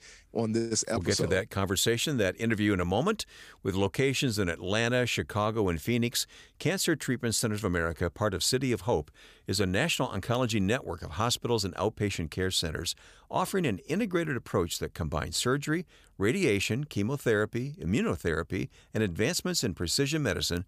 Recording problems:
none

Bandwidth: 15 kHz